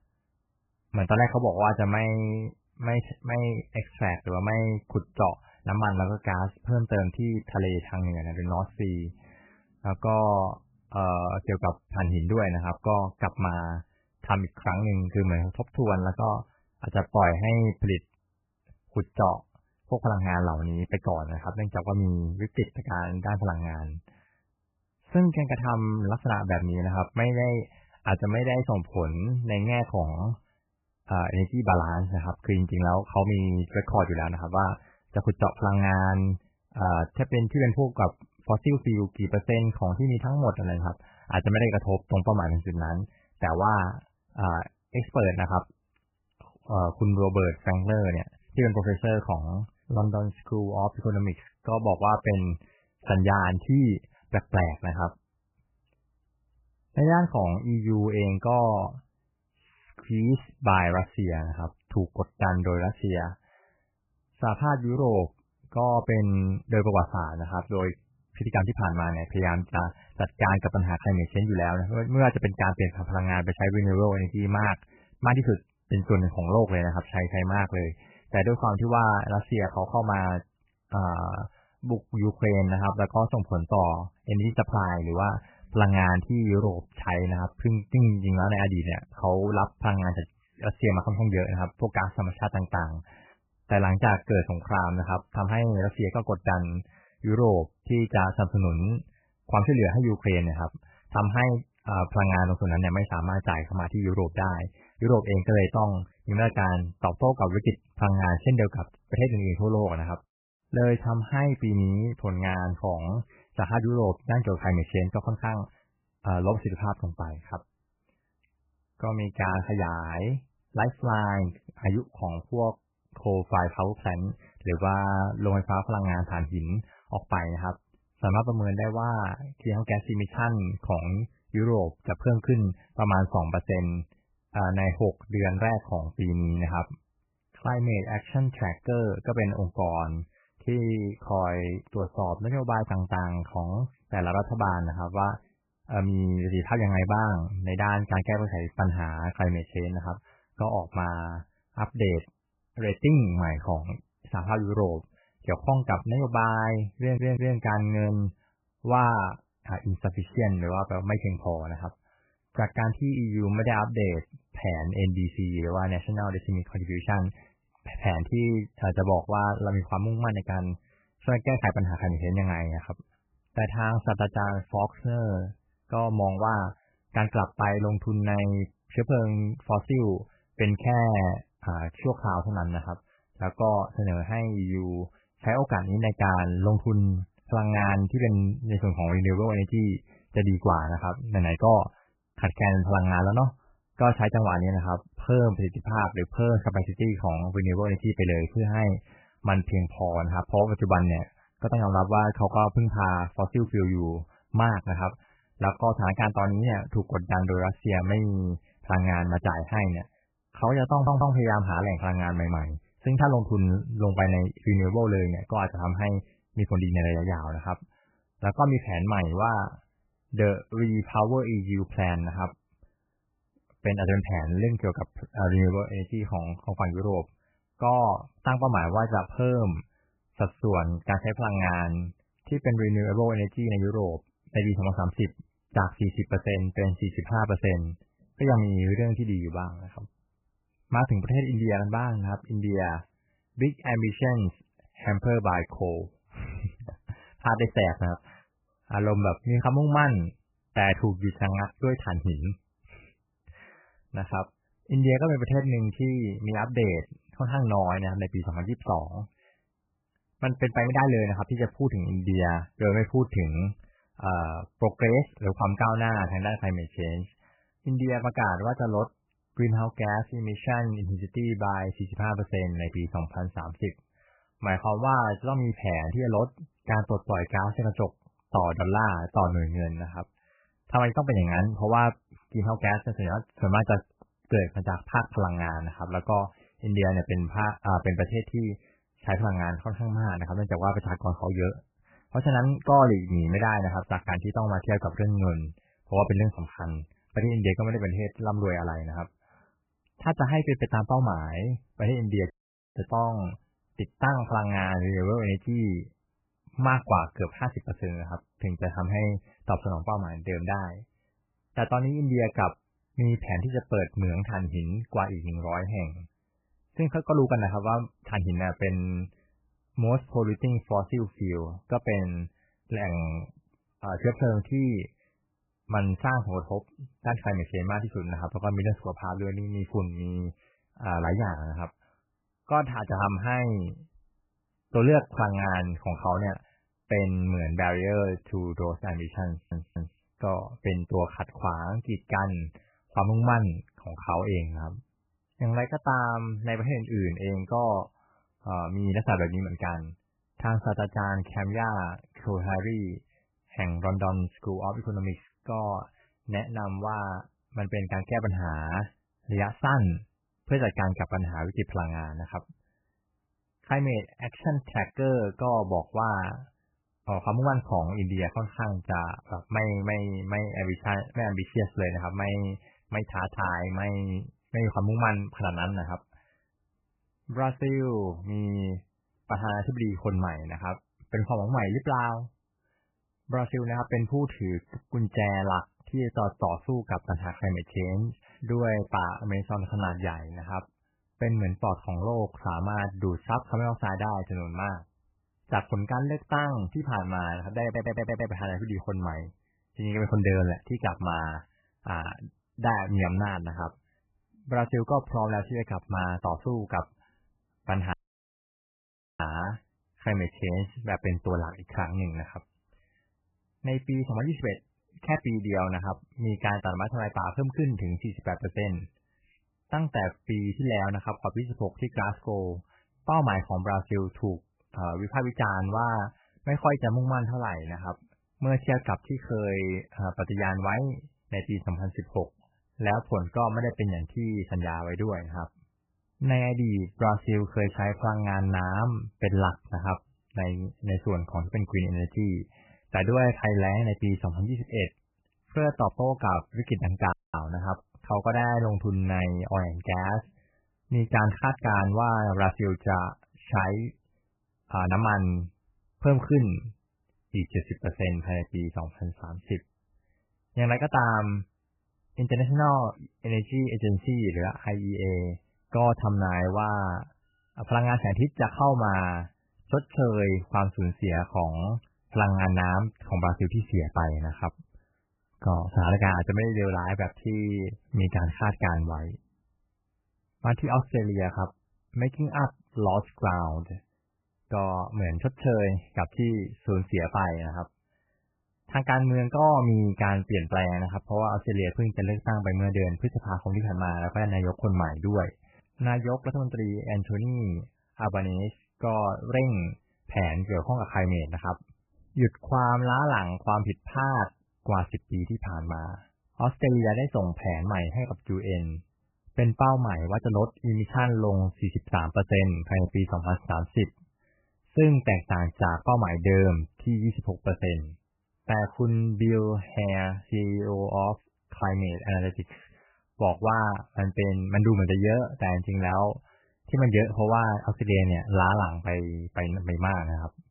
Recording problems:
garbled, watery; badly; nothing above 3 kHz
audio stuttering; 4 times, first at 2:37
audio cutting out; at 5:03, at 6:48 for 1.5 s and at 7:27

